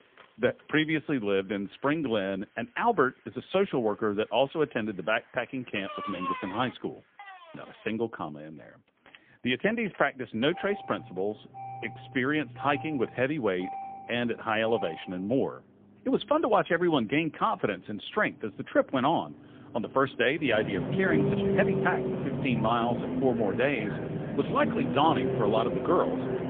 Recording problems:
phone-call audio; poor line; nothing above 3.5 kHz
traffic noise; loud; throughout; 4 dB below the speech

